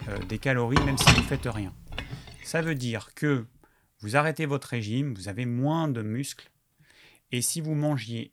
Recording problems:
household noises; very loud; until 2.5 s; 4 dB above the speech

